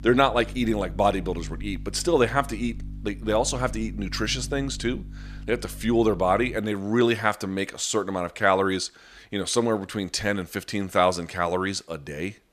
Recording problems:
electrical hum; faint; until 6.5 s; 50 Hz, 25 dB below the speech

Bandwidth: 14.5 kHz